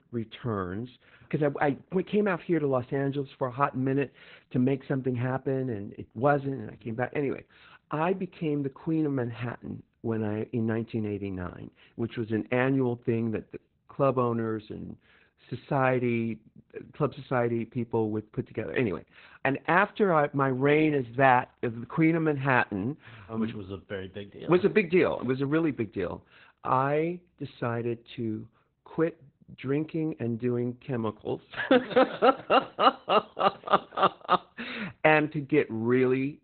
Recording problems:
garbled, watery; badly; nothing above 4 kHz
high-pitched whine; very faint; throughout; 2 kHz, 70 dB below the speech

